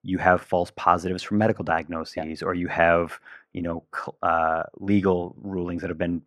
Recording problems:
muffled; slightly; fading above 3 kHz

